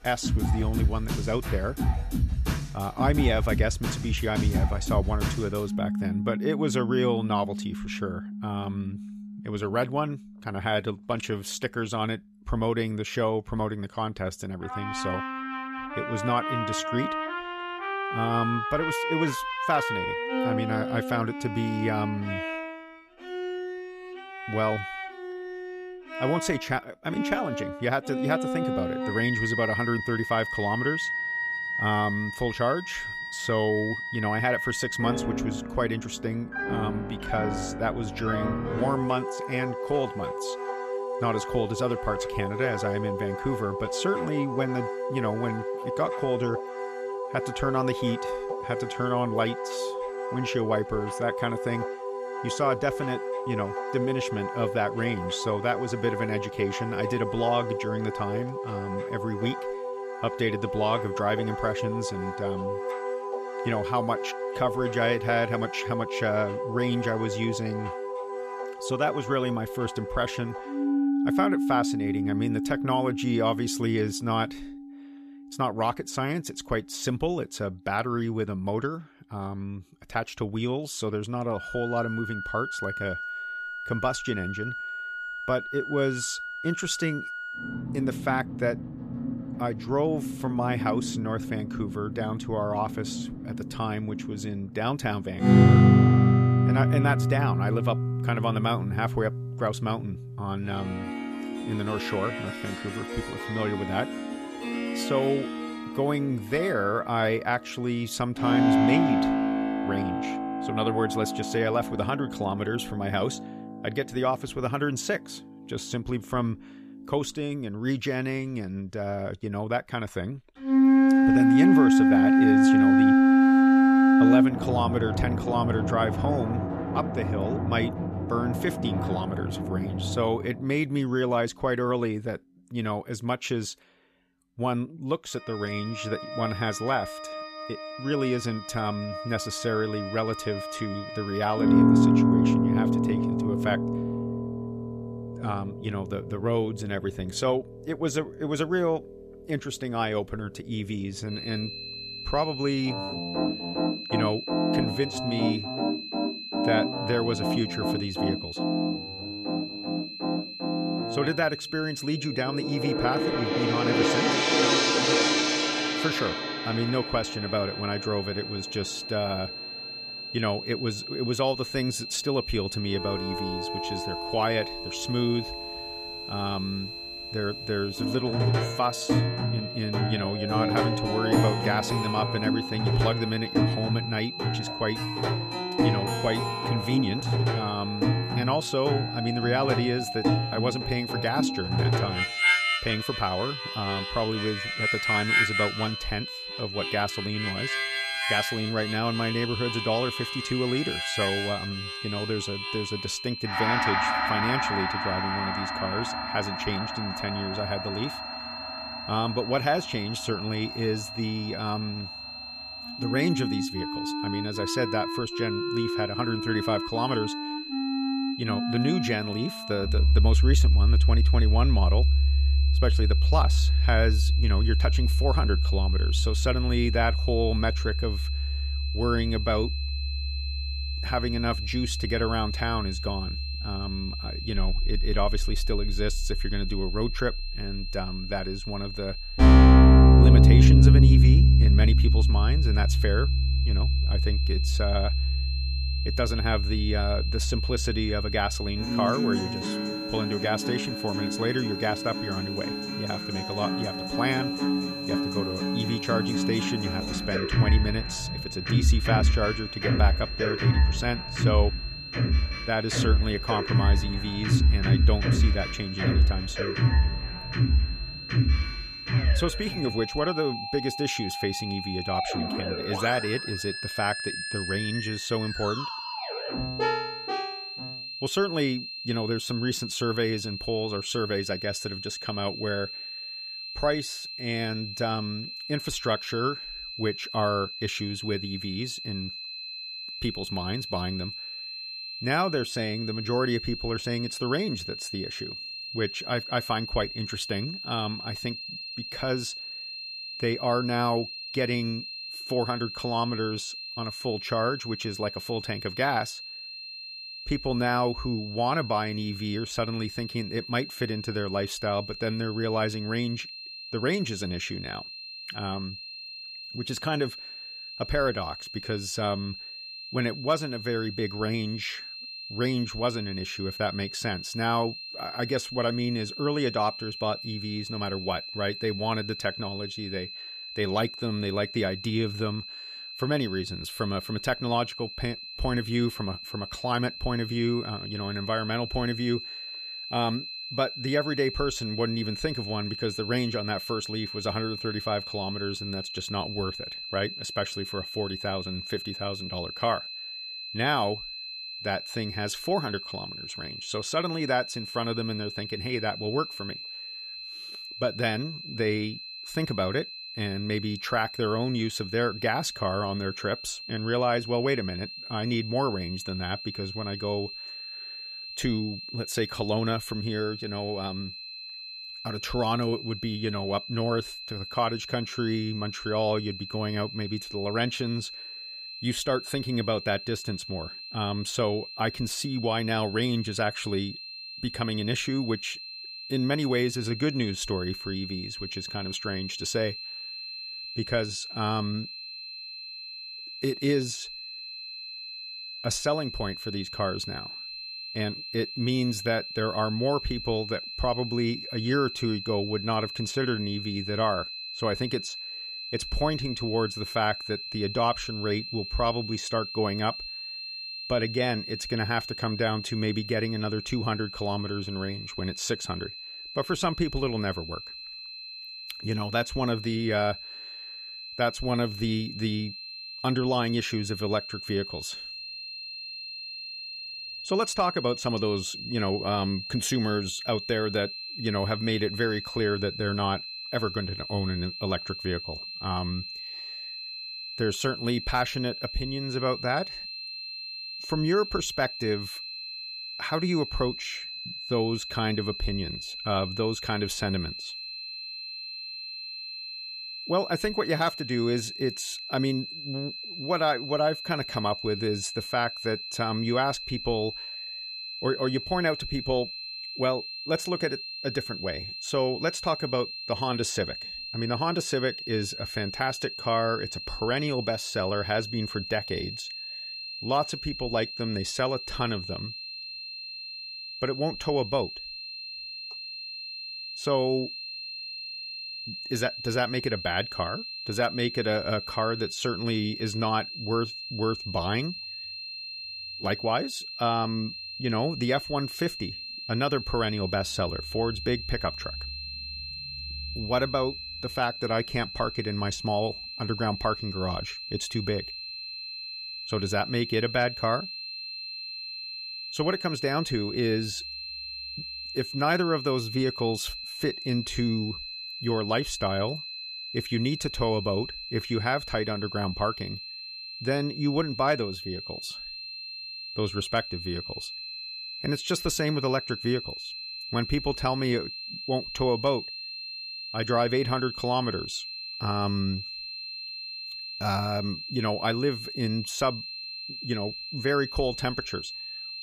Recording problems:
background music; very loud; until 4:37; 3 dB above the speech
high-pitched whine; loud; from 2:31 on; 4 kHz, 6 dB below the speech

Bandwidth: 14.5 kHz